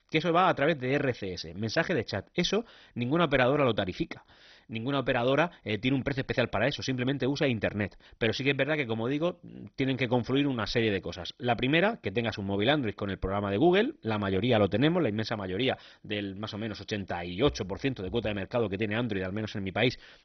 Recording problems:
garbled, watery; badly; nothing above 6 kHz

